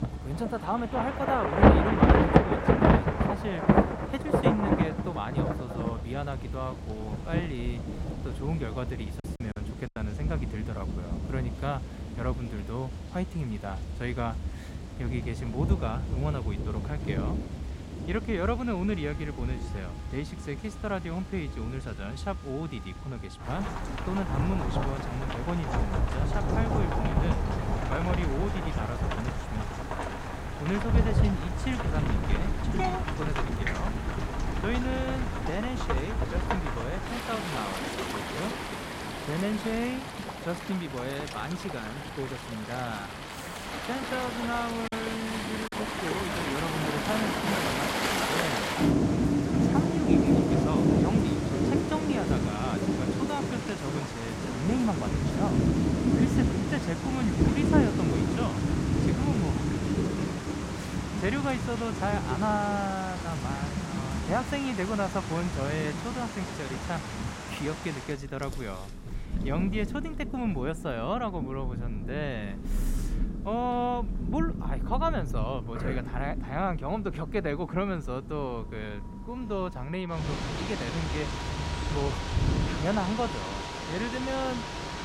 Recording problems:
rain or running water; very loud; throughout; 4 dB above the speech
background music; noticeable; throughout; 20 dB below the speech
choppy; very; at 9 s and at 45 s; 6% of the speech affected

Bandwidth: 16 kHz